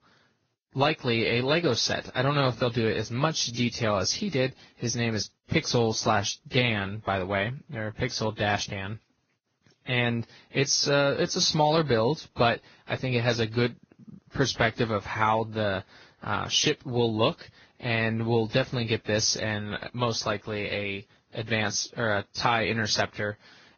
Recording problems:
garbled, watery; badly; nothing above 6.5 kHz

